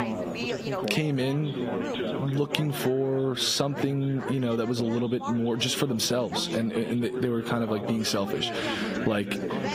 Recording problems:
squashed, flat; heavily, background pumping
garbled, watery; slightly; nothing above 15.5 kHz
background chatter; loud; throughout; 4 voices, 7 dB below the speech

